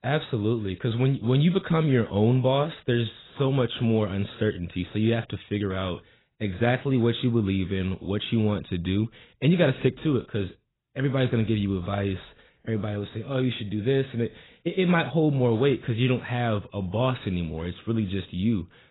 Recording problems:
garbled, watery; badly; nothing above 4 kHz

